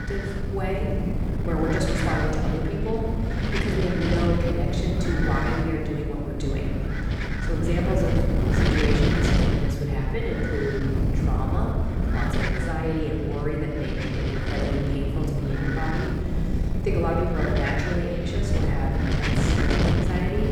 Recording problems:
off-mic speech; far
room echo; noticeable; dies away in 2.2 s
wind noise on the microphone; heavy; 1 dB below the speech
low rumble; faint; from 6.5 s on; 25 dB below the speech
electrical hum; very faint; throughout; 50 Hz, 25 dB below the speech

